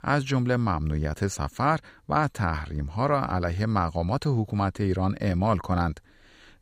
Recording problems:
none

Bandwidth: 15.5 kHz